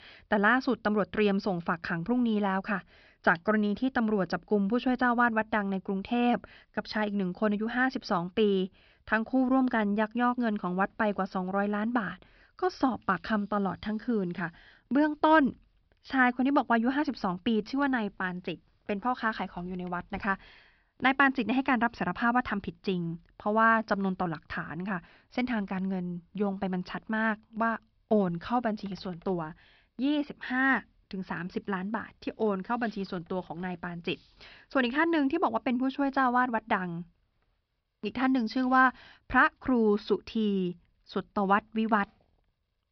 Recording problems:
high frequencies cut off; noticeable; nothing above 5.5 kHz

